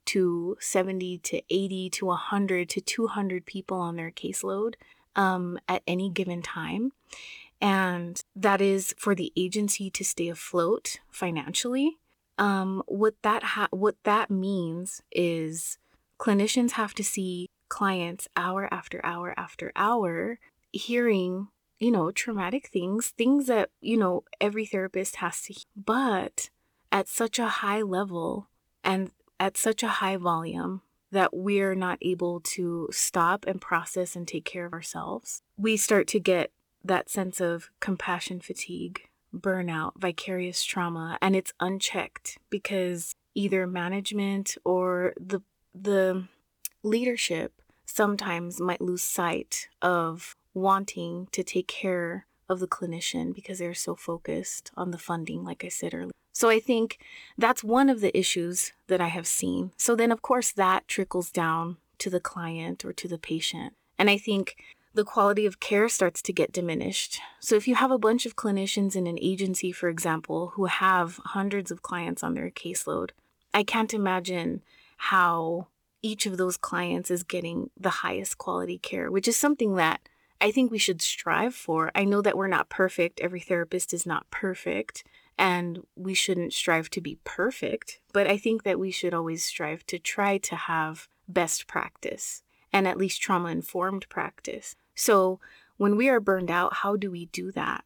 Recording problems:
uneven, jittery; strongly; from 7.5 s to 1:28

